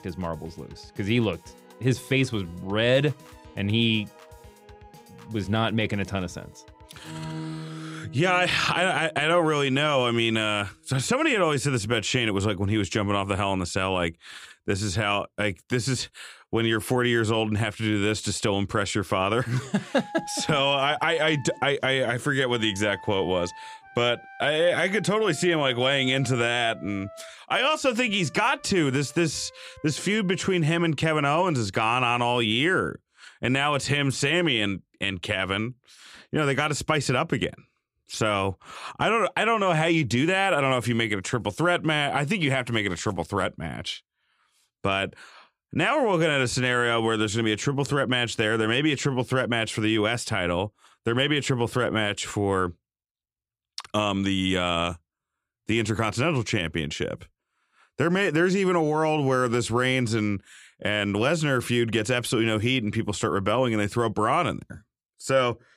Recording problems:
background music; noticeable; until 31 s; 20 dB below the speech

